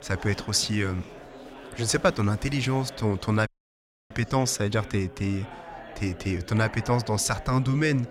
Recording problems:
chatter from many people; noticeable; throughout; 15 dB below the speech
audio cutting out; at 3.5 s for 0.5 s

